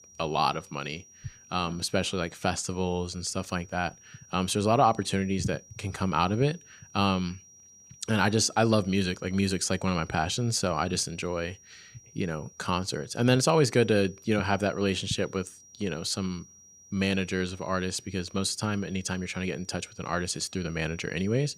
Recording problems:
high-pitched whine; faint; throughout; 5.5 kHz, 25 dB below the speech

